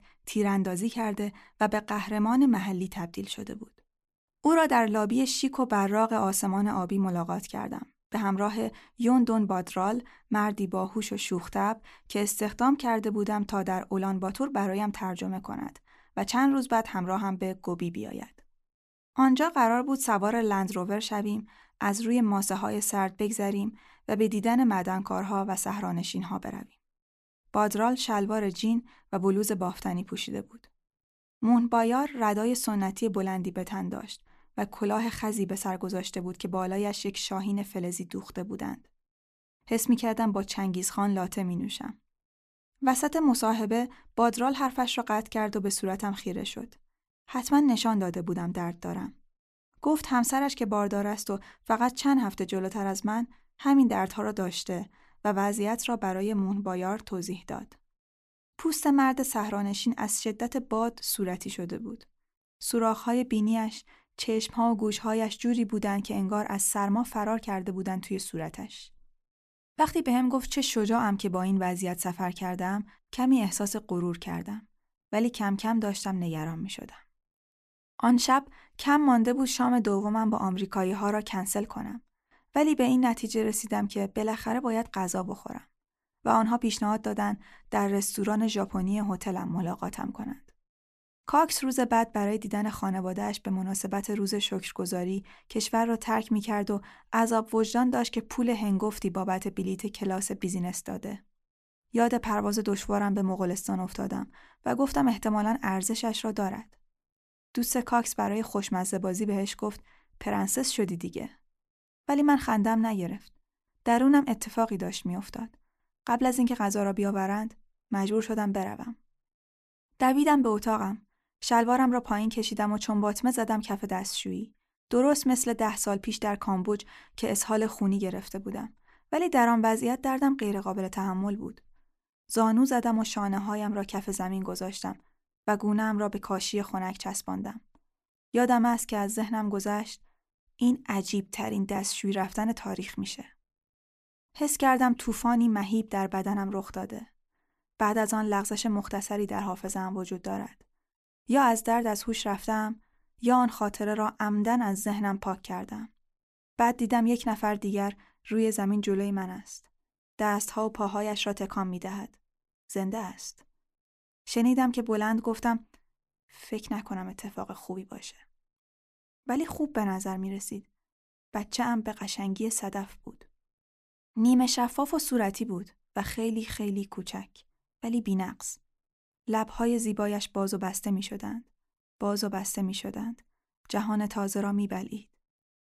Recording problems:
none

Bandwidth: 14 kHz